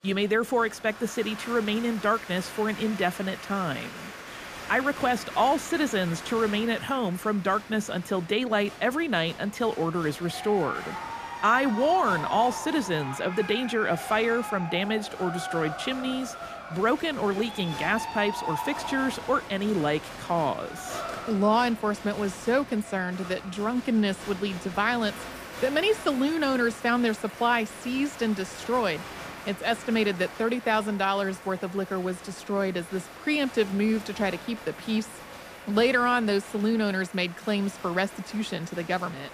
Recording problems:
crowd noise; noticeable; throughout; 10 dB below the speech

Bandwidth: 15 kHz